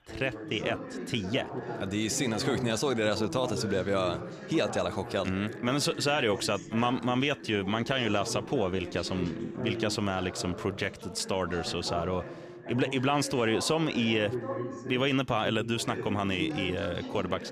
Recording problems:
background chatter; loud; throughout; 3 voices, 9 dB below the speech

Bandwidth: 15 kHz